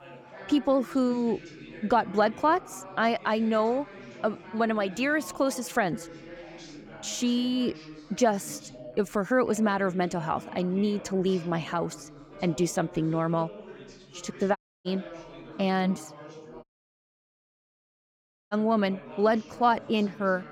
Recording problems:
background chatter; noticeable; throughout; 3 voices, 15 dB below the speech
audio cutting out; at 15 s and at 17 s for 2 s

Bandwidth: 17.5 kHz